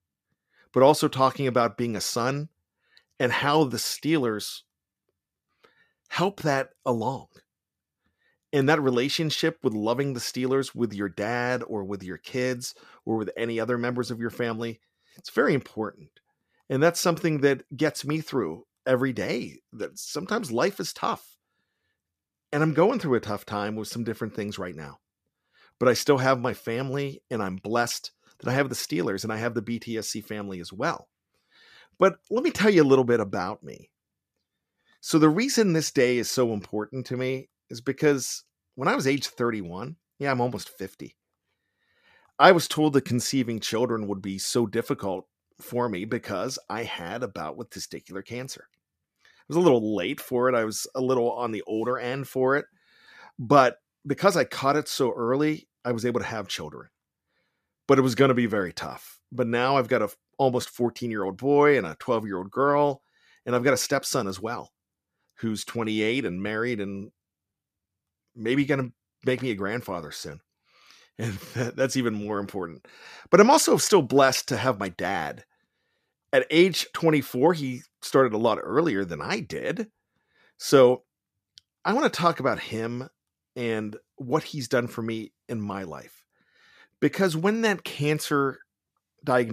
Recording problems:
abrupt cut into speech; at the end

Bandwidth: 14.5 kHz